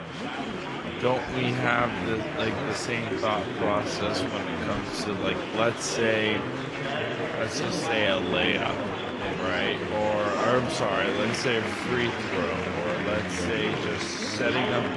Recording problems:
wrong speed, natural pitch; too slow; 0.7 times normal speed
garbled, watery; slightly; nothing above 11 kHz
chatter from many people; loud; throughout; 2 dB below the speech

